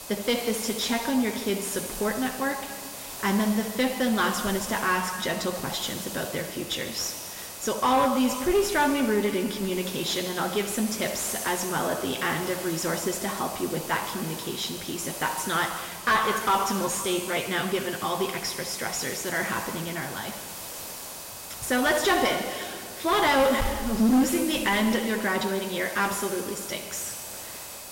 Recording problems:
room echo; noticeable; dies away in 2.1 s
distortion; slight; 10 dB below the speech
off-mic speech; somewhat distant
hiss; noticeable; throughout; 10 dB below the speech
high-pitched whine; faint; throughout; 2.5 kHz, 20 dB below the speech

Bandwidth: 16 kHz